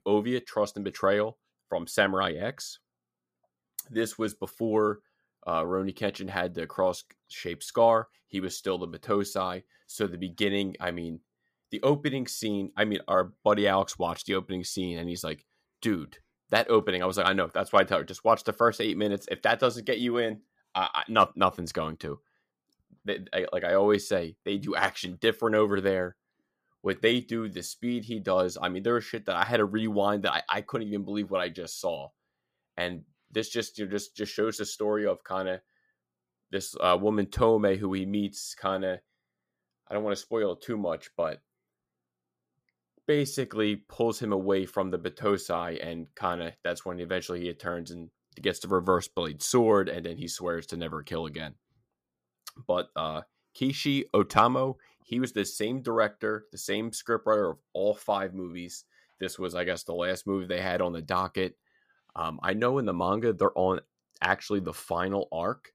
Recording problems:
none

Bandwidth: 15 kHz